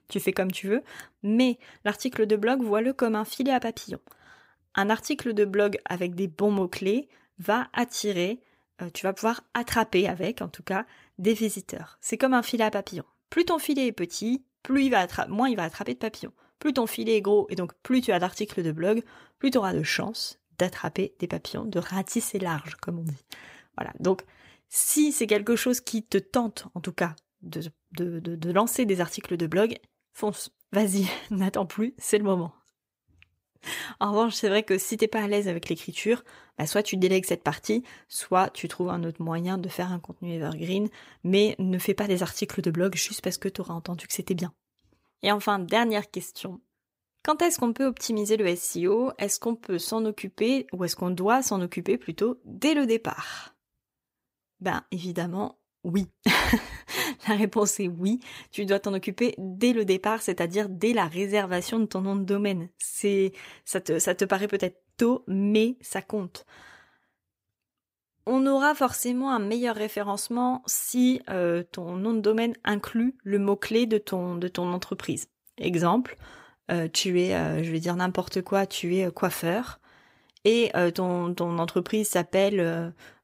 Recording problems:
none

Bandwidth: 15.5 kHz